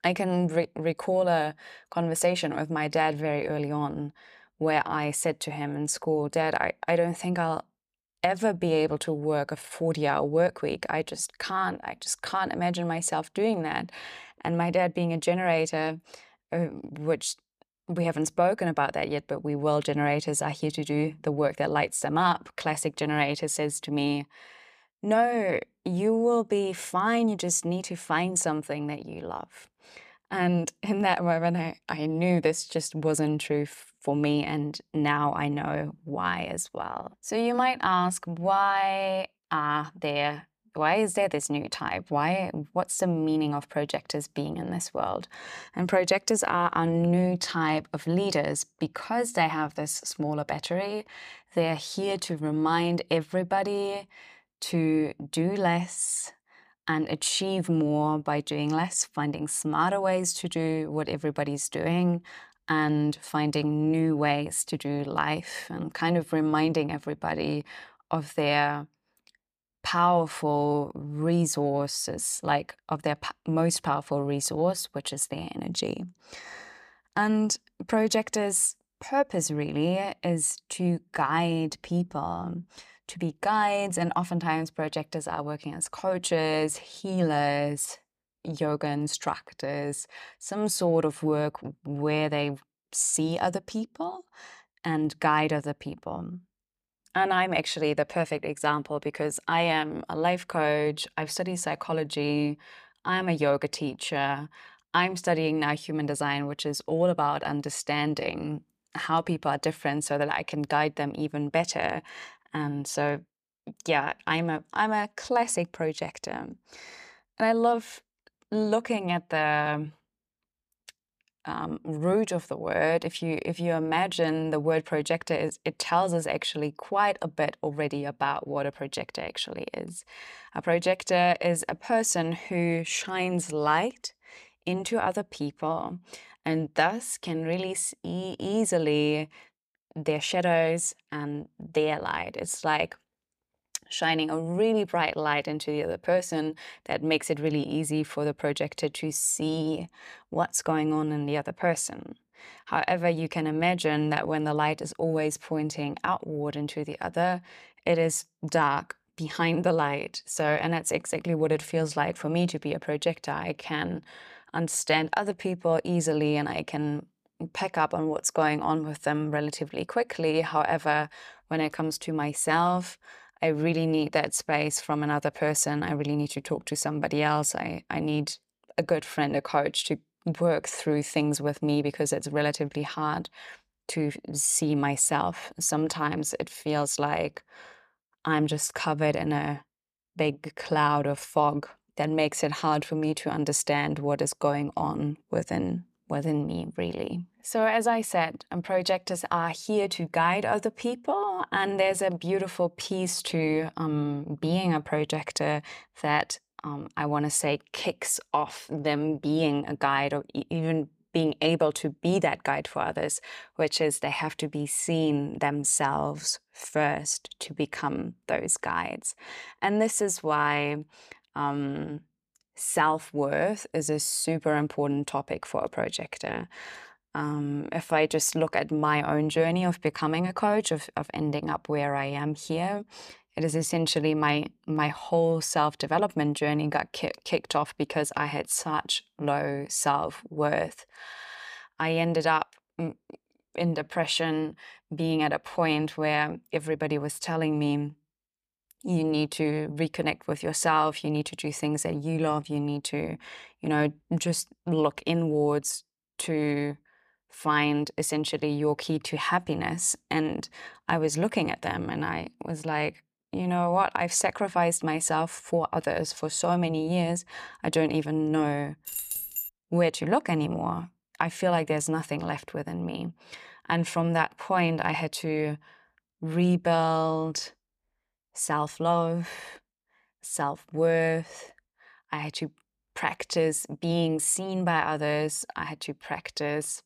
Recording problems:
audio stuttering; at 4:01
jangling keys; noticeable; at 4:29; peak 3 dB below the speech

